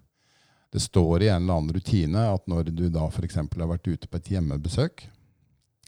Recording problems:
none

